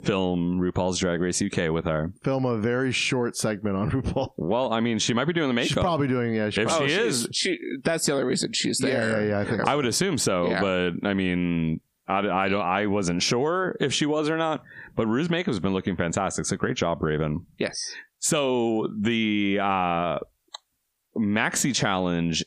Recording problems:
squashed, flat; heavily

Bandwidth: 15 kHz